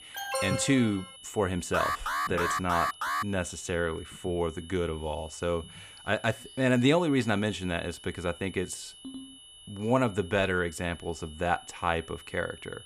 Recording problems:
high-pitched whine; noticeable; throughout; 3 kHz, 20 dB below the speech
alarm; noticeable; at the start and from 1.5 to 3 s; peak level with the speech
phone ringing; faint; at 9 s; peak 15 dB below the speech

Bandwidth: 14.5 kHz